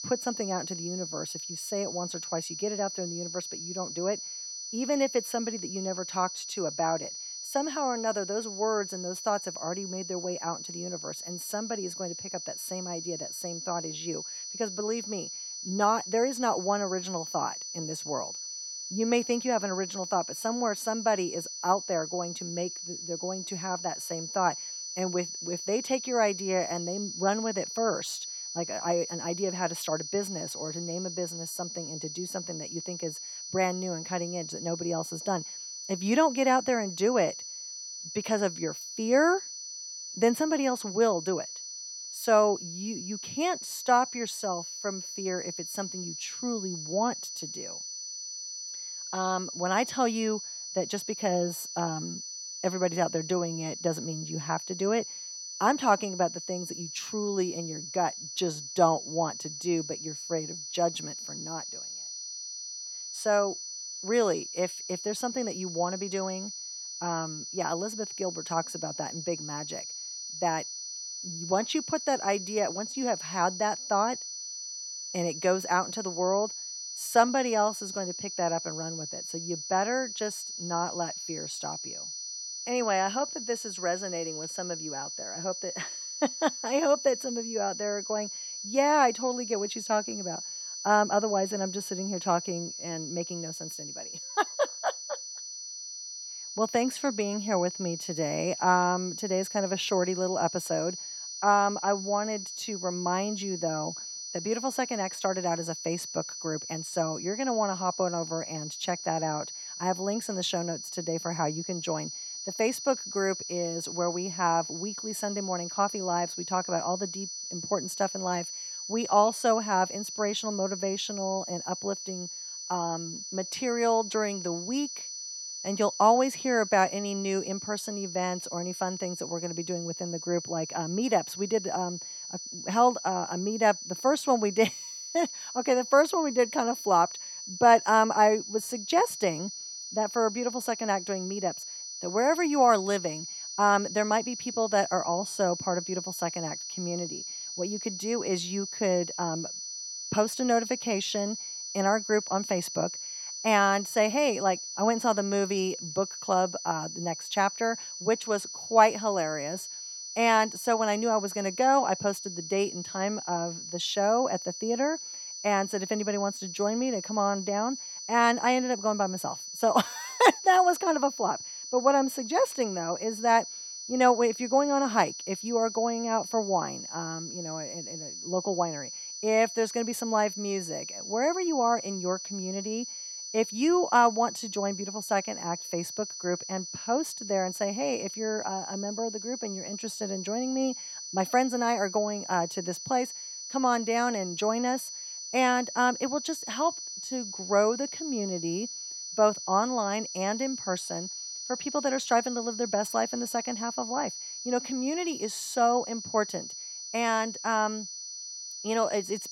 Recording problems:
high-pitched whine; loud; throughout; 6 kHz, 7 dB below the speech

